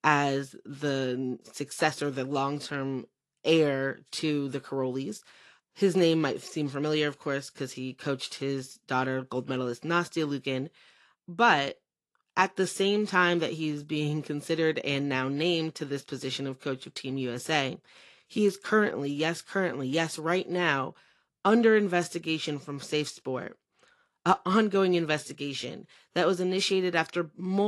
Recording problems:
garbled, watery; slightly; nothing above 11.5 kHz
abrupt cut into speech; at the end

